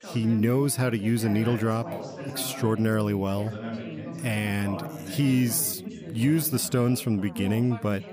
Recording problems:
background chatter; noticeable; throughout; 4 voices, 10 dB below the speech

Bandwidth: 15 kHz